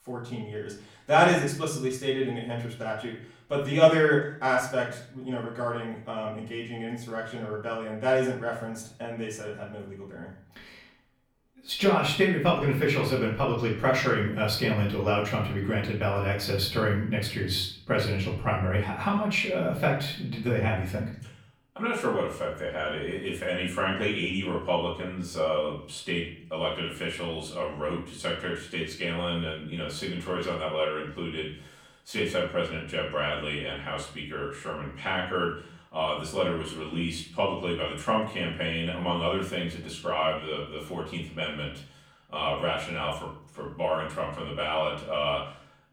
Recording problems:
off-mic speech; far
room echo; slight; dies away in 0.5 s

